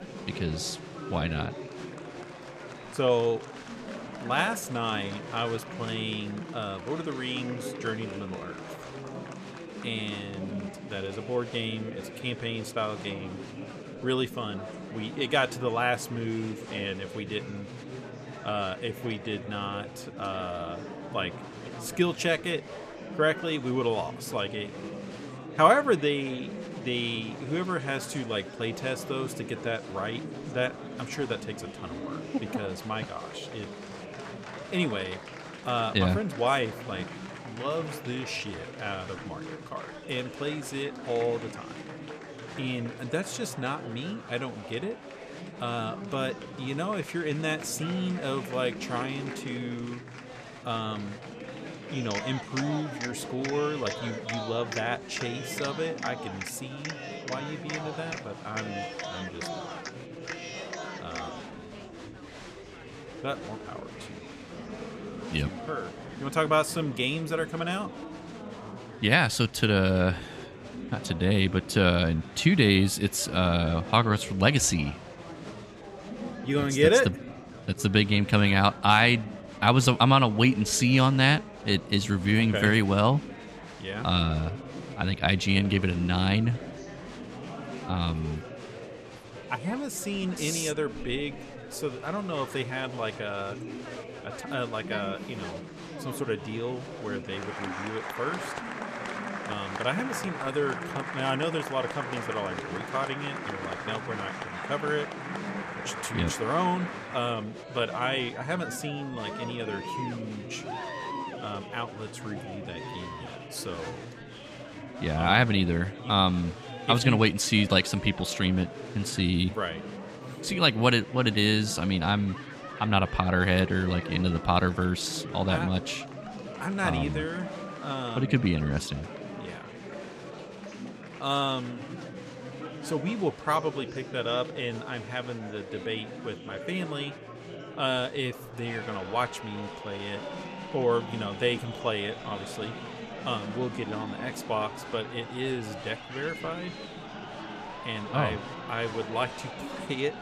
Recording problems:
chatter from many people; noticeable; throughout; 10 dB below the speech

